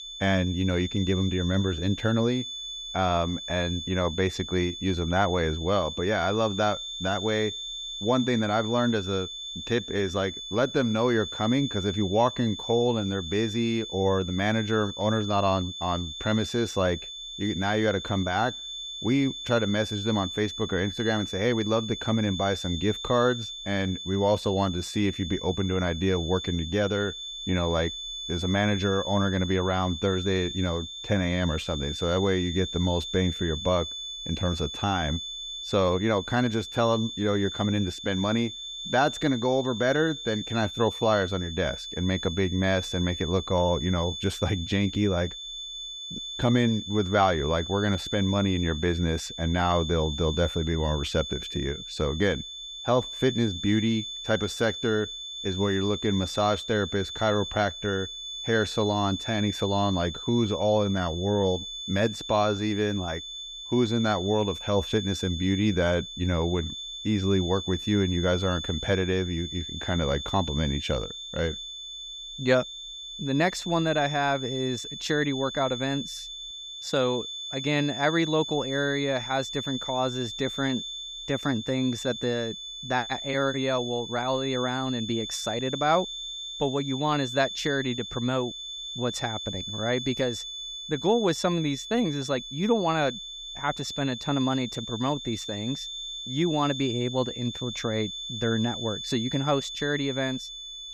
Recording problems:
high-pitched whine; loud; throughout; 3.5 kHz, 7 dB below the speech

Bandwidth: 14.5 kHz